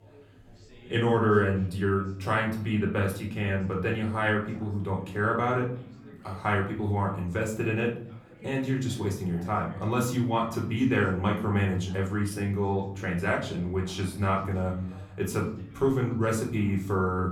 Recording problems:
off-mic speech; far
room echo; slight; dies away in 0.6 s
background chatter; faint; throughout; 4 voices, 25 dB below the speech

